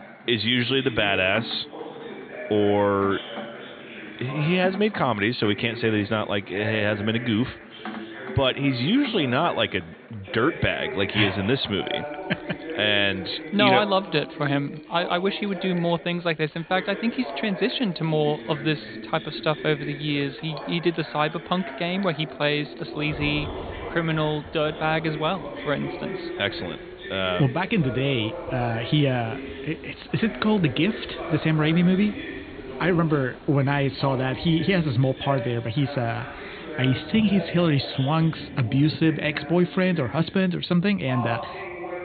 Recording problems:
high frequencies cut off; severe; nothing above 4.5 kHz
rain or running water; noticeable; throughout; 20 dB below the speech
background chatter; noticeable; throughout; 2 voices, 10 dB below the speech

